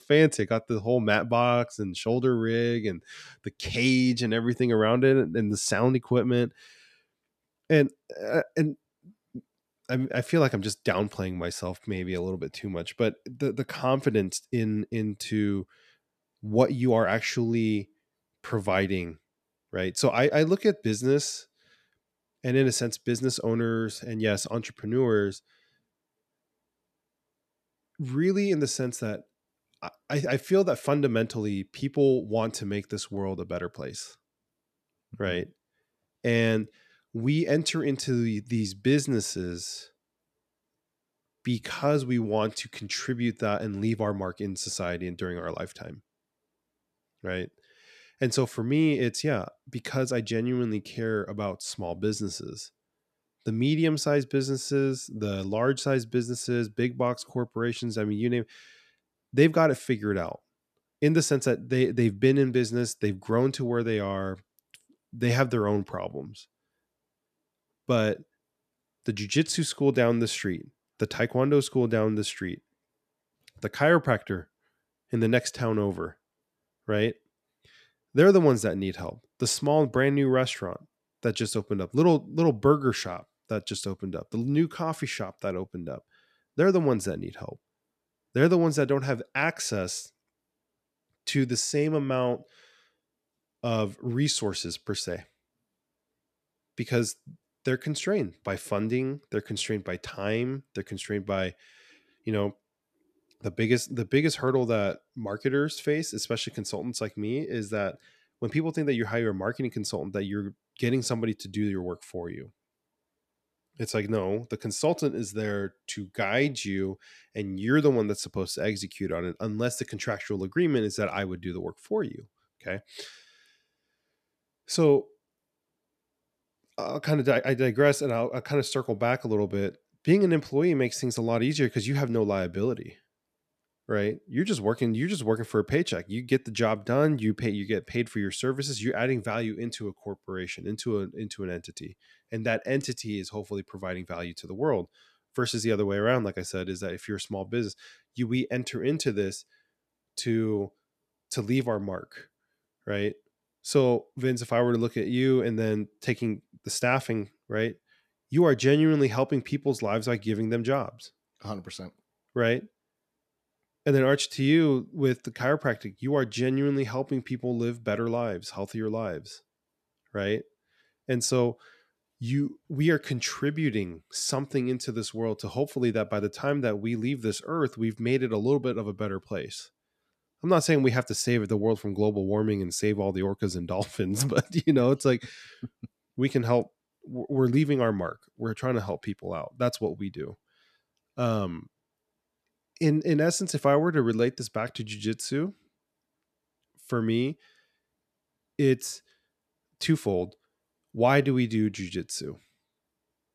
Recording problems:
none

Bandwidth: 14 kHz